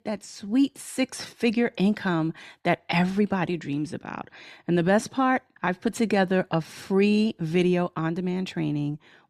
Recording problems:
none

